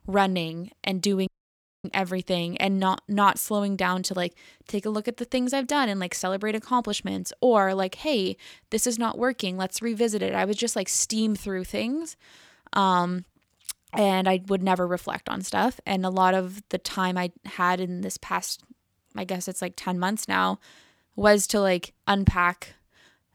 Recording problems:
audio cutting out; at 1.5 s for 0.5 s

